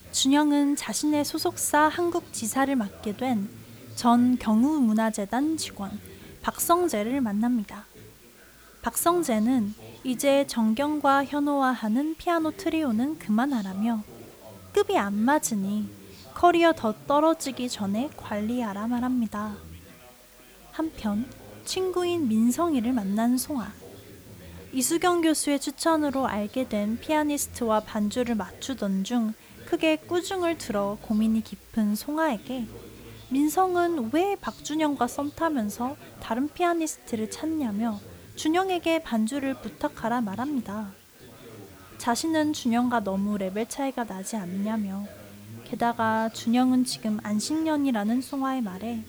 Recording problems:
chatter from many people; faint; throughout; 20 dB below the speech
hiss; faint; throughout; 25 dB below the speech

